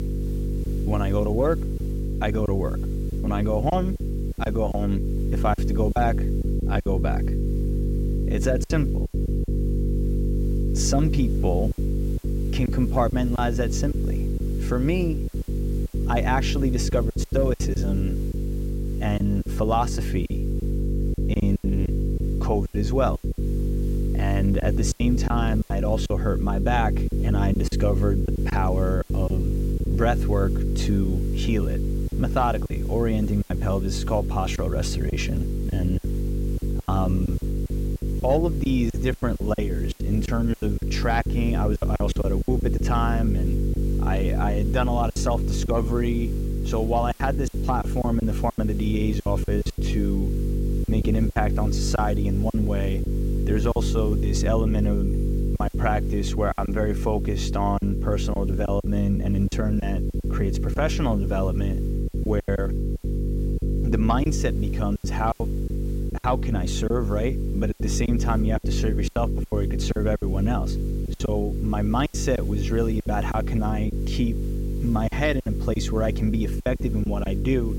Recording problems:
electrical hum; loud; throughout; 50 Hz, 8 dB below the speech
hiss; faint; throughout; 25 dB below the speech
choppy; very; 9% of the speech affected

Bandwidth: 16 kHz